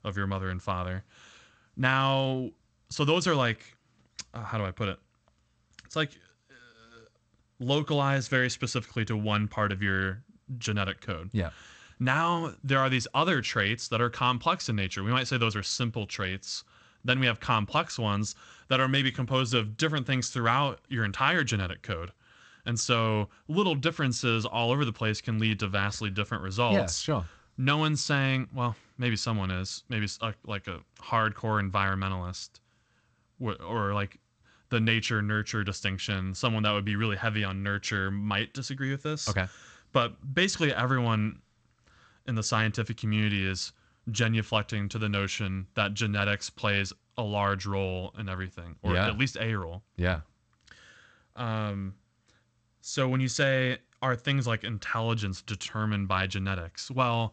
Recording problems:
garbled, watery; slightly; nothing above 8 kHz

